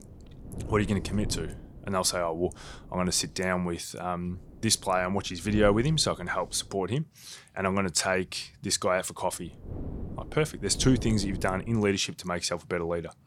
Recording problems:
wind noise on the microphone; occasional gusts; until 3.5 s, from 4.5 to 7 s and from 9.5 to 12 s; 20 dB below the speech

